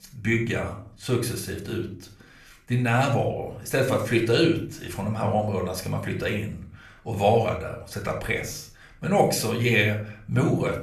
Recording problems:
room echo; slight; dies away in 0.5 s
off-mic speech; somewhat distant

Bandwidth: 14 kHz